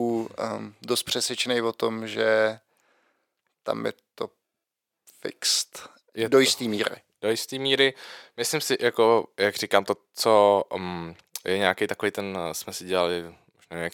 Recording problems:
thin; very; fading below 500 Hz
abrupt cut into speech; at the start

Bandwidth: 17 kHz